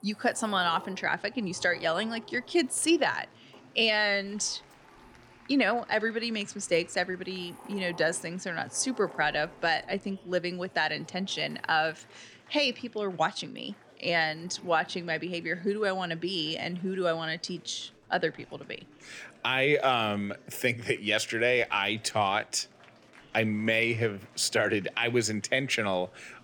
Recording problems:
household noises; faint; throughout; 25 dB below the speech
chatter from many people; faint; throughout; 25 dB below the speech

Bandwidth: 17.5 kHz